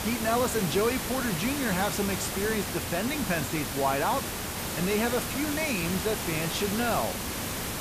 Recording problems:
hiss; loud; throughout; 2 dB below the speech

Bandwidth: 14.5 kHz